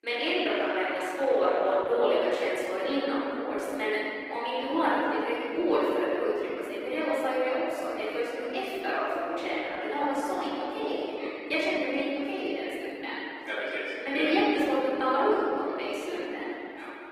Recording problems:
room echo; strong; dies away in 3 s
off-mic speech; far
garbled, watery; slightly; nothing above 15.5 kHz
thin; very slightly; fading below 300 Hz

